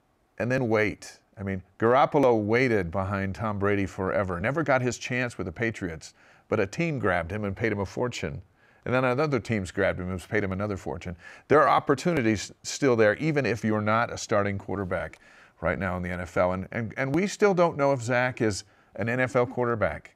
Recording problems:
none

